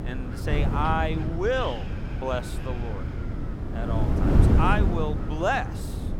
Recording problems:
wind noise on the microphone; heavy; 7 dB below the speech

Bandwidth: 17 kHz